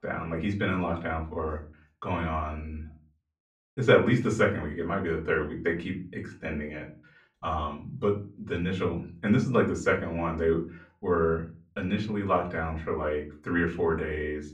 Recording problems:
off-mic speech; far
room echo; very slight; dies away in 0.3 s

